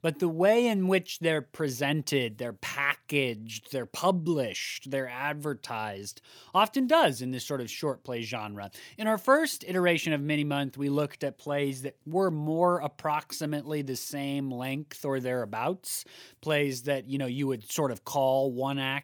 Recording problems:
none

